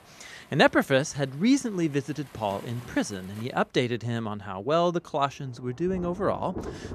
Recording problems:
rain or running water; noticeable; throughout; 20 dB below the speech

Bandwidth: 14.5 kHz